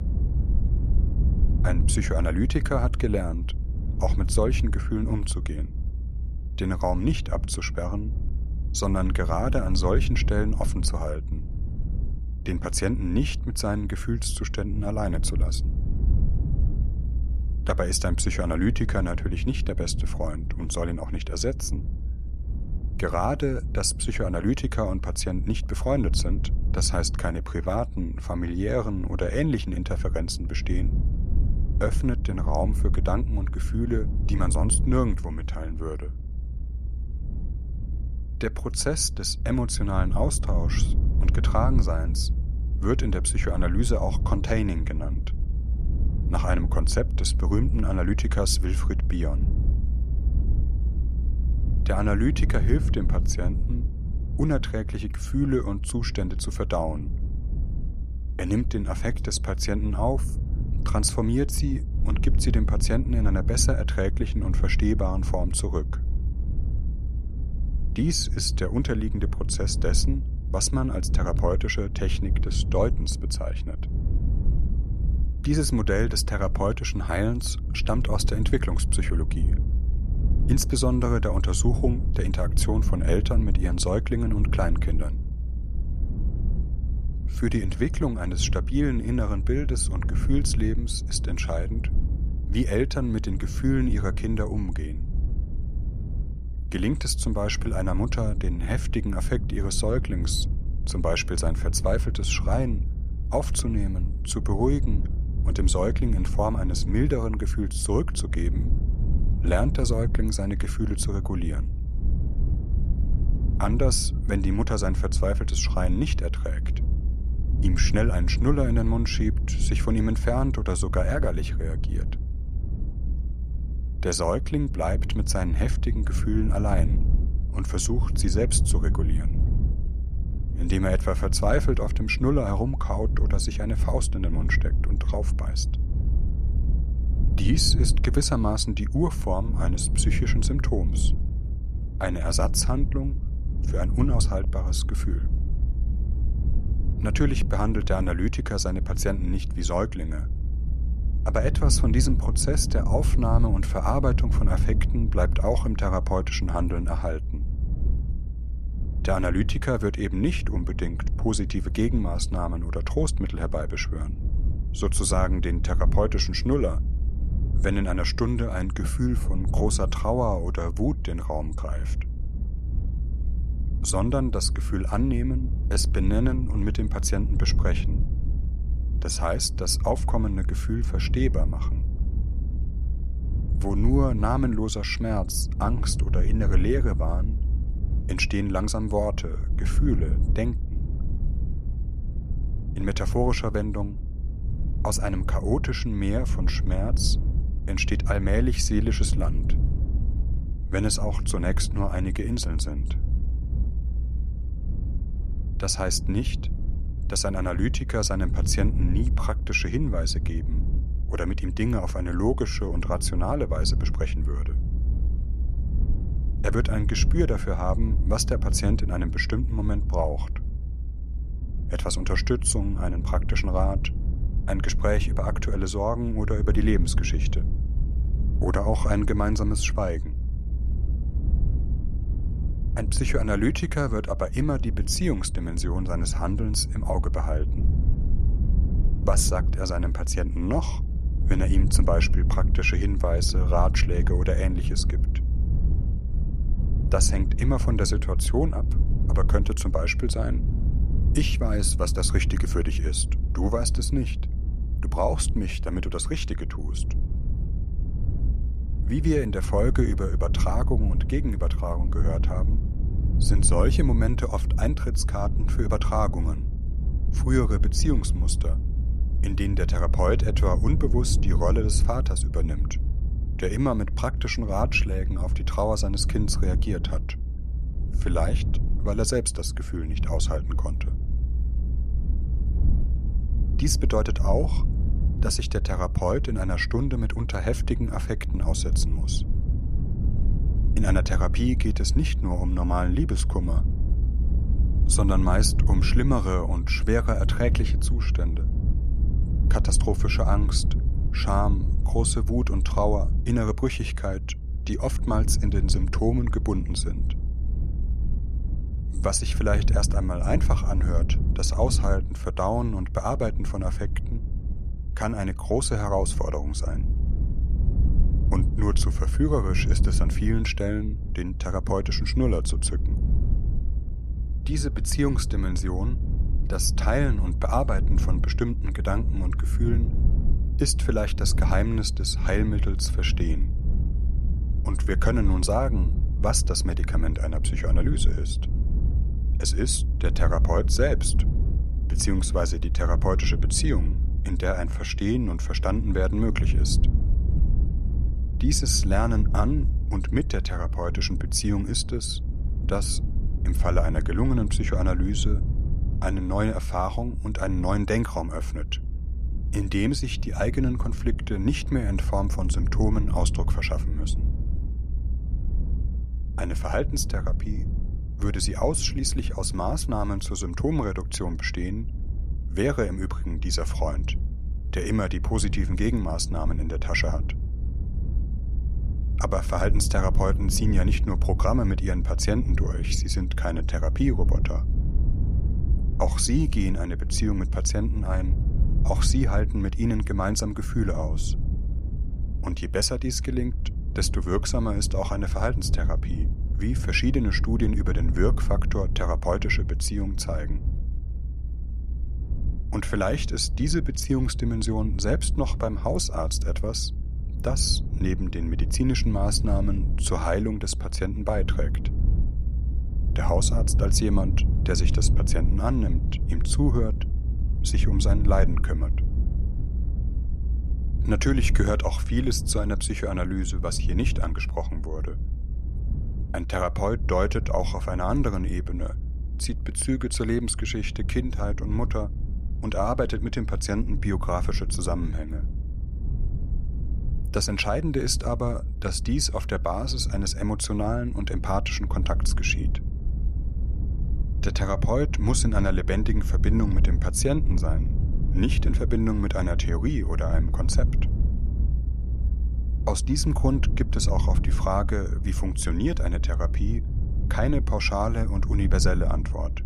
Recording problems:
low rumble; noticeable; throughout; 15 dB below the speech

